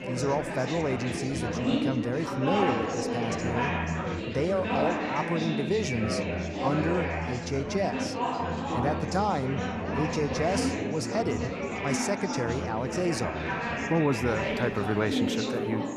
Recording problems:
chatter from many people; very loud; throughout; as loud as the speech

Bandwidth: 15 kHz